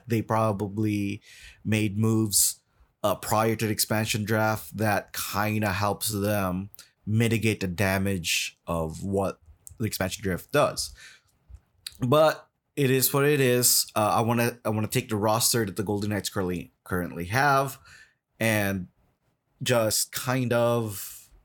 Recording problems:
uneven, jittery; strongly; from 1.5 to 21 s

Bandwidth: 18.5 kHz